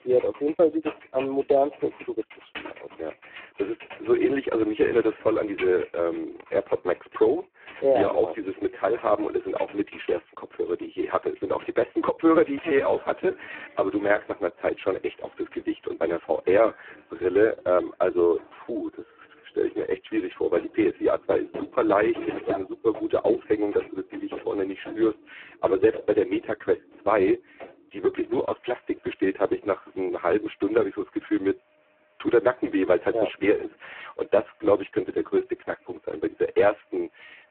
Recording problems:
phone-call audio; poor line; nothing above 3.5 kHz
household noises; noticeable; throughout; 20 dB below the speech

